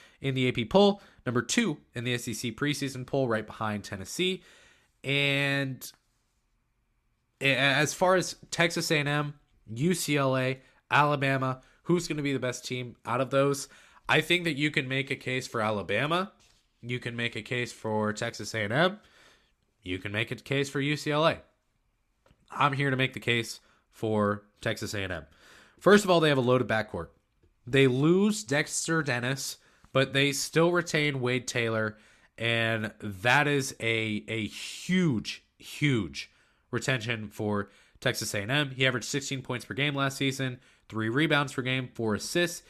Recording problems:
none

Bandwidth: 14 kHz